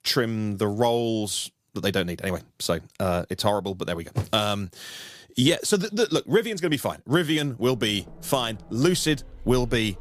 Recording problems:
traffic noise; faint; from 7.5 s on; 20 dB below the speech

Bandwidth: 15 kHz